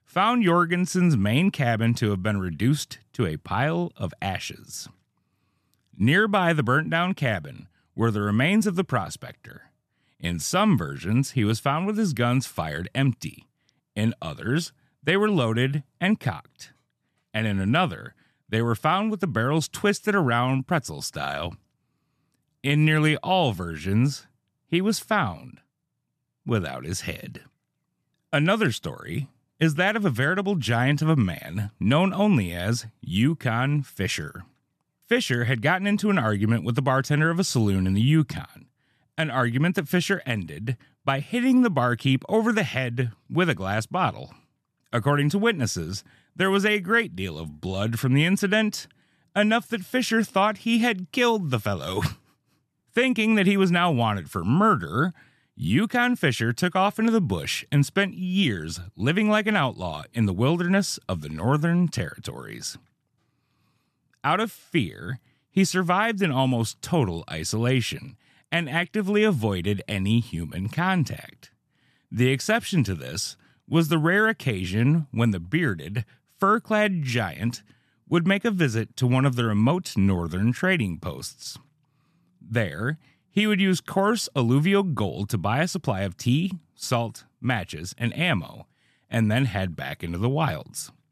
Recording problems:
none

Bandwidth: 13.5 kHz